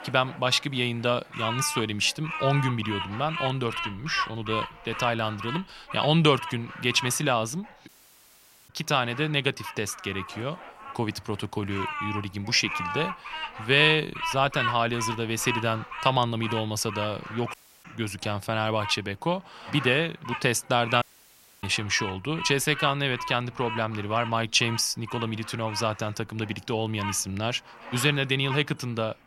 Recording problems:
animal sounds; loud; throughout; 9 dB below the speech
audio cutting out; at 8 s for 1 s, at 18 s and at 21 s for 0.5 s

